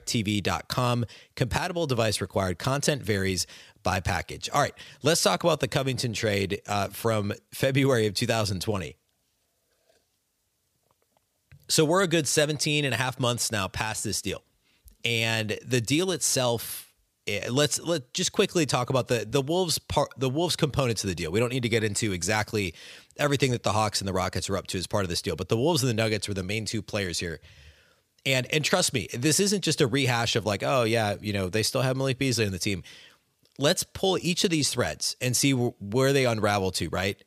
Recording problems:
none

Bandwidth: 15 kHz